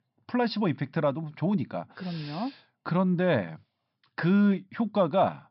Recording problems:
high frequencies cut off; noticeable; nothing above 5.5 kHz

